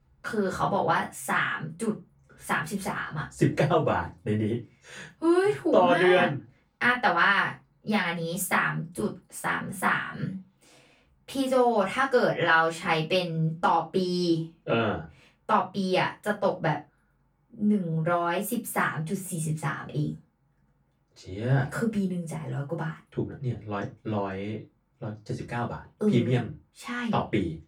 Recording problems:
off-mic speech; far
room echo; very slight; dies away in 0.2 s

